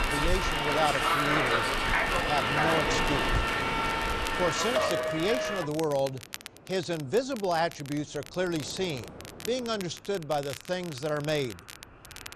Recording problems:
train or aircraft noise; very loud; throughout; 4 dB above the speech
crackle, like an old record; noticeable; 15 dB below the speech

